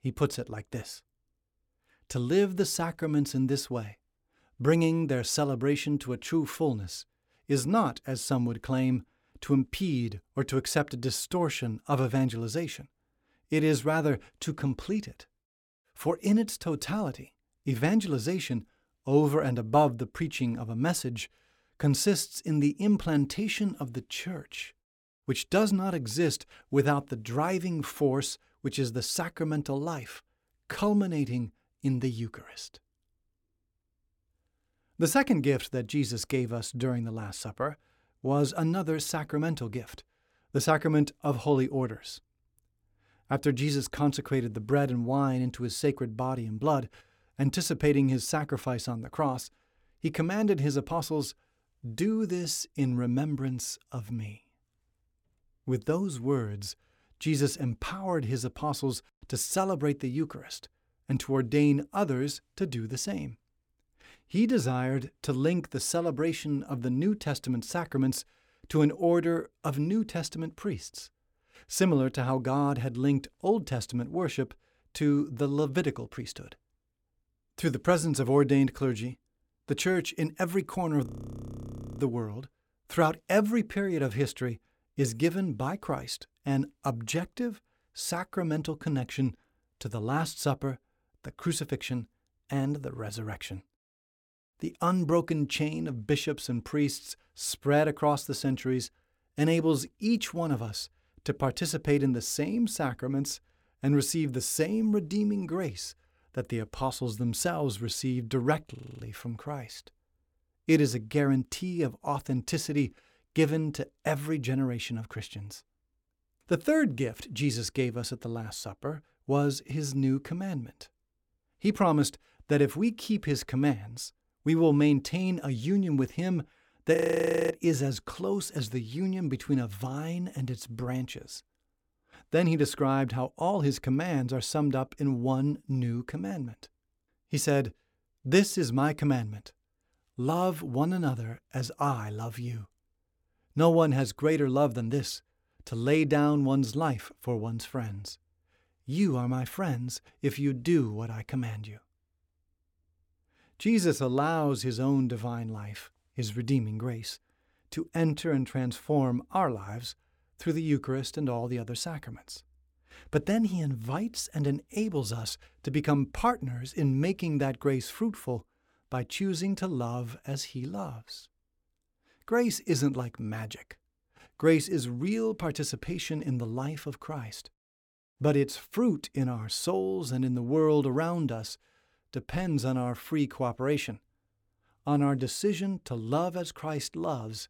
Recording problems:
audio freezing; at 1:21 for 1 s, at 1:49 and at 2:07 for 0.5 s

